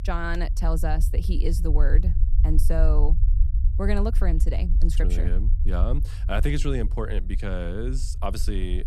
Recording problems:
low rumble; noticeable; throughout; 15 dB below the speech

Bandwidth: 14 kHz